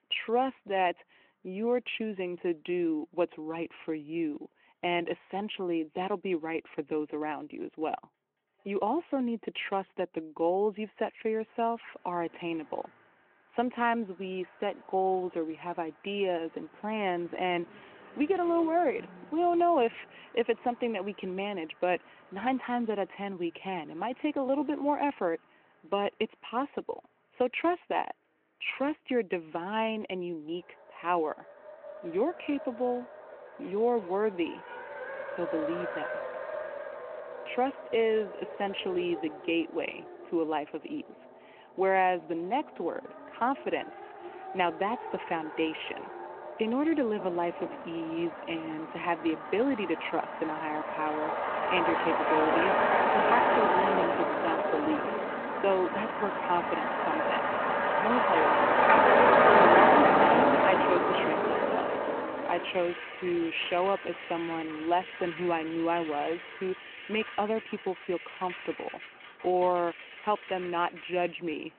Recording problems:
phone-call audio
traffic noise; very loud; throughout; 4 dB above the speech

